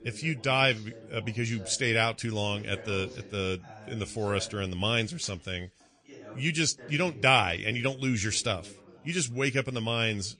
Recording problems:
garbled, watery; slightly; nothing above 9.5 kHz
background chatter; faint; throughout; 3 voices, 20 dB below the speech

